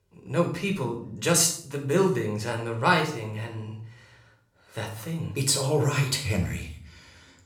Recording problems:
room echo; slight; dies away in 0.5 s
off-mic speech; somewhat distant

